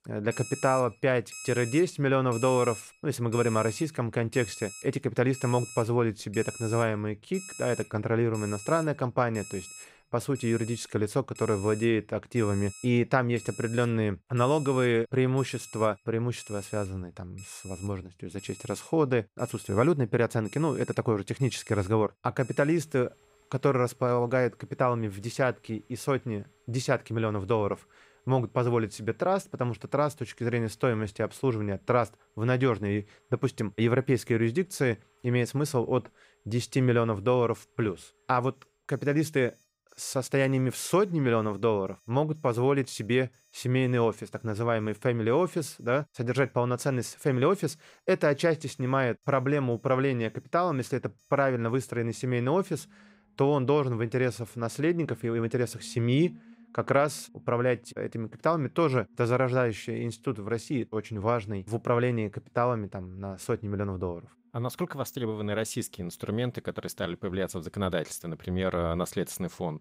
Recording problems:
alarms or sirens; noticeable; throughout; 15 dB below the speech

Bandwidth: 15.5 kHz